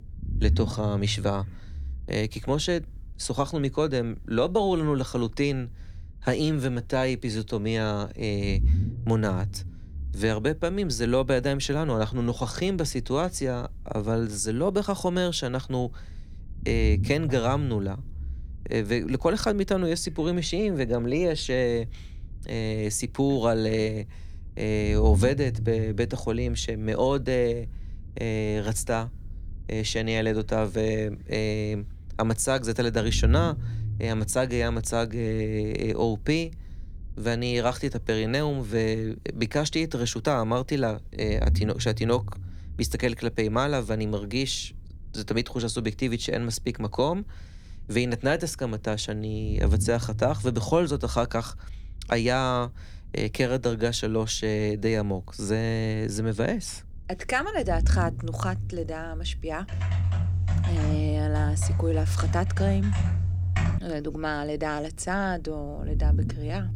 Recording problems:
low rumble; faint; throughout; 20 dB below the speech
keyboard typing; loud; from 1:00 to 1:04; peak 2 dB above the speech

